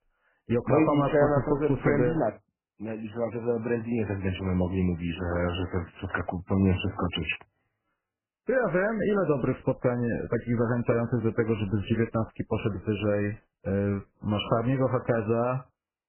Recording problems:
garbled, watery; badly; nothing above 3 kHz

